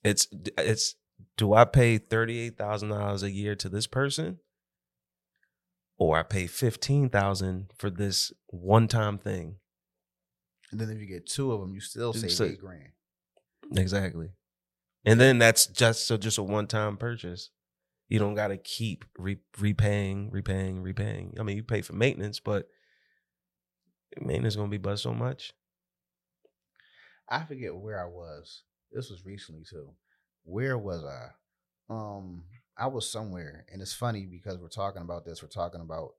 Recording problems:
none

